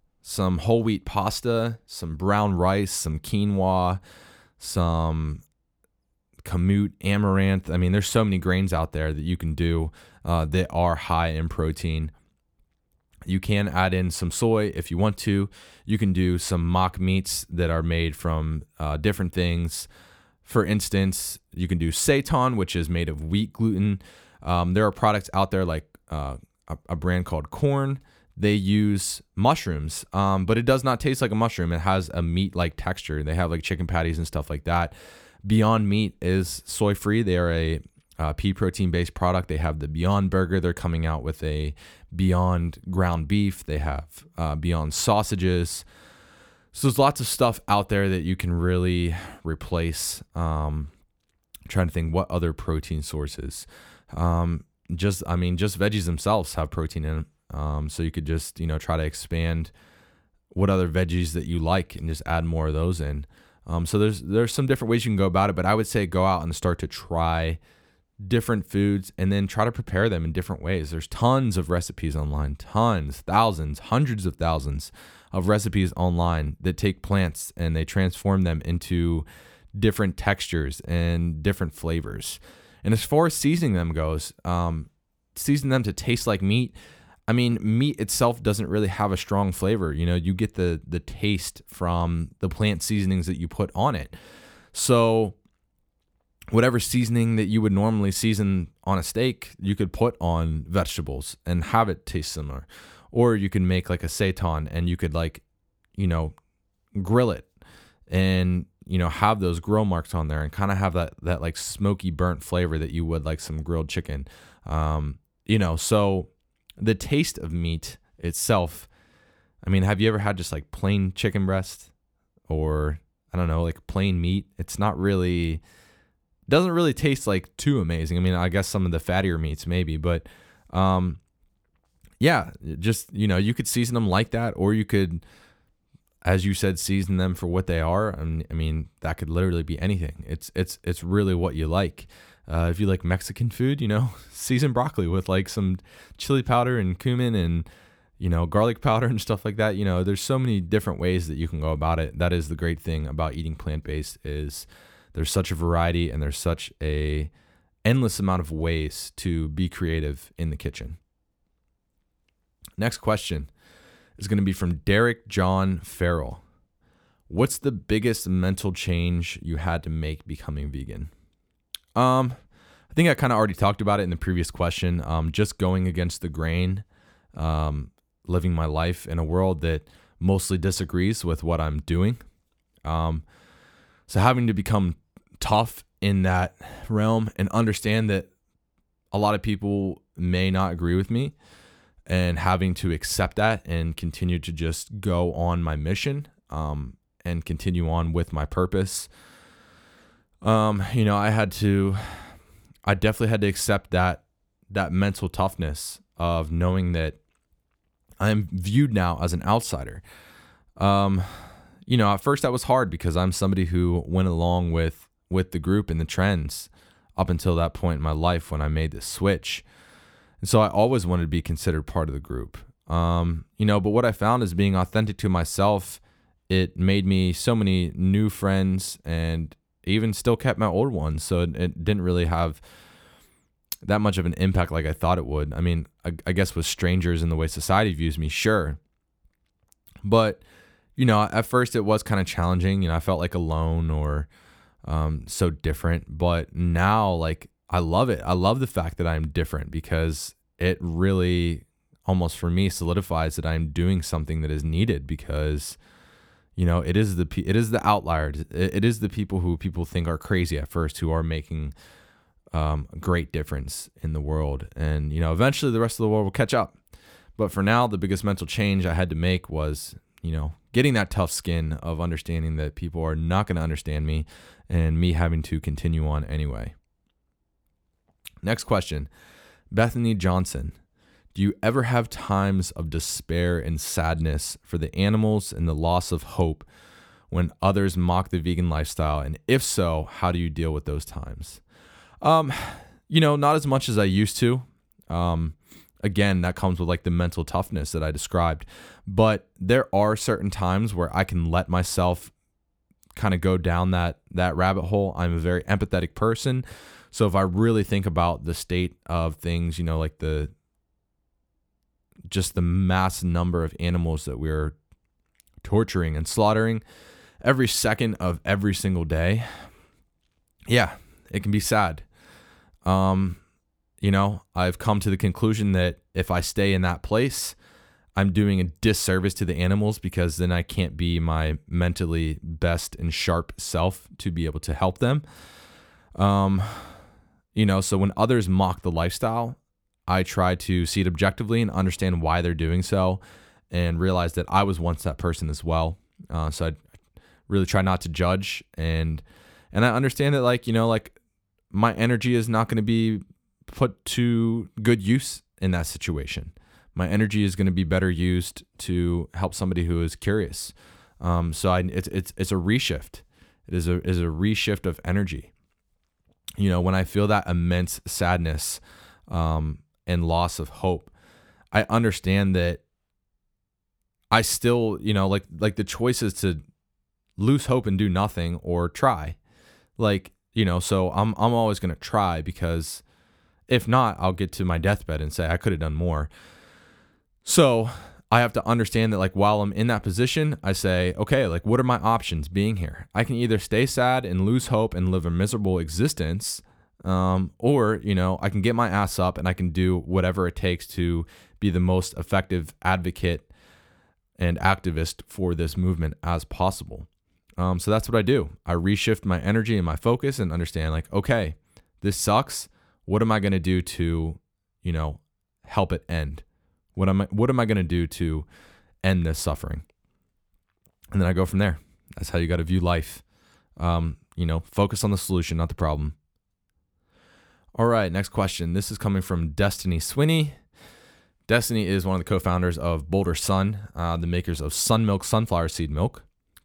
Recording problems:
none

